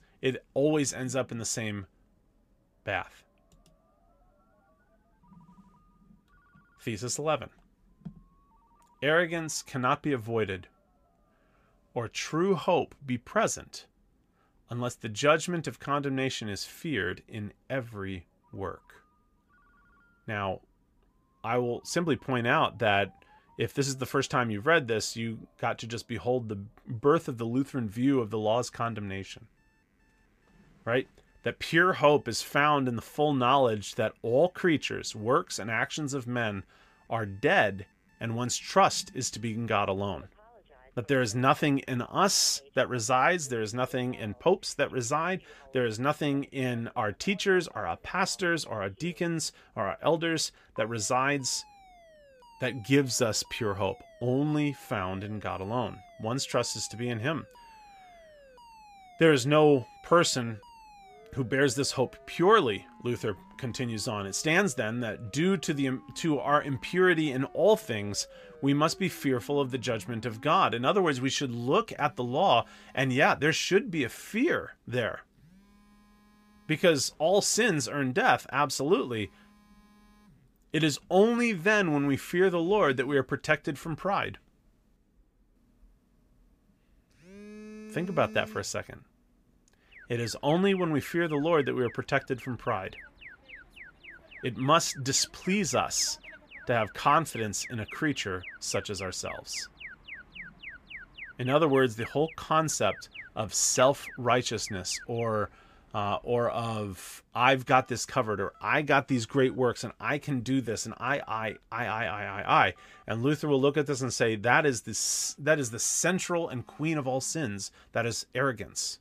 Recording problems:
alarms or sirens; faint; throughout; 20 dB below the speech

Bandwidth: 15 kHz